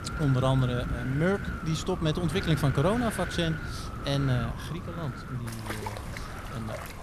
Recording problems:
wind noise on the microphone; heavy; 6 dB below the speech
rain or running water; noticeable; throughout; 10 dB below the speech

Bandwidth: 14.5 kHz